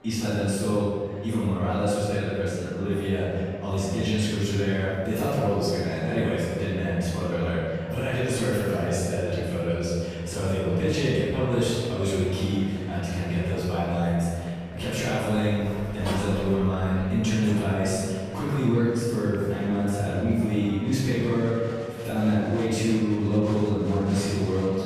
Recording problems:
room echo; strong; dies away in 2.1 s
off-mic speech; far
murmuring crowd; faint; throughout; 20 dB below the speech
door banging; noticeable; from 14 to 18 s; peak 7 dB below the speech

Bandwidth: 15 kHz